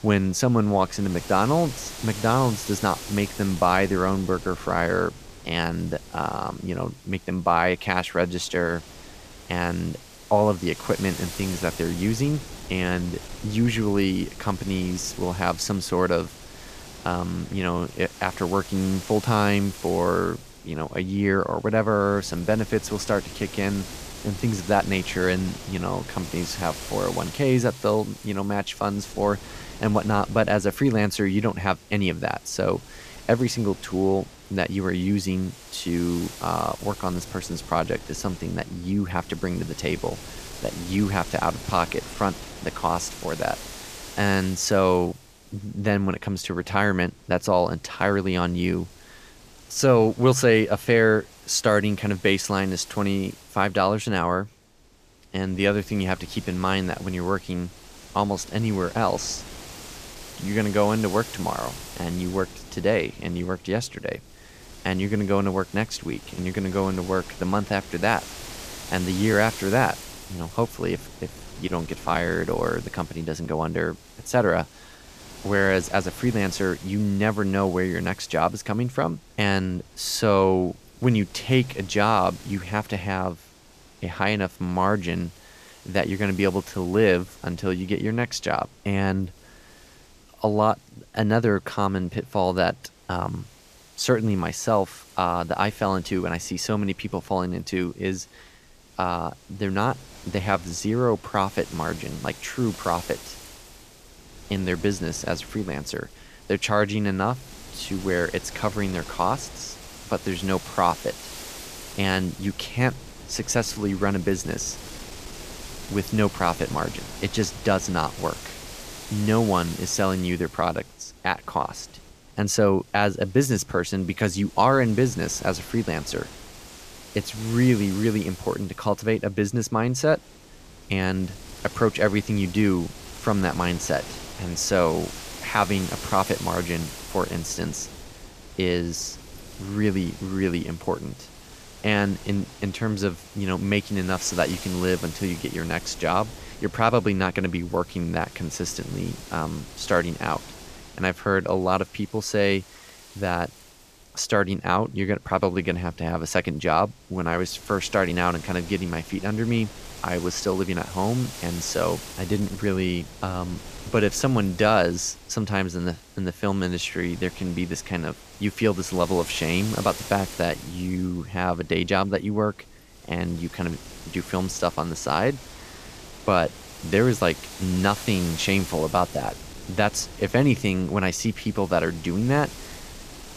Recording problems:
wind noise on the microphone; occasional gusts; 15 dB below the speech

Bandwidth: 14.5 kHz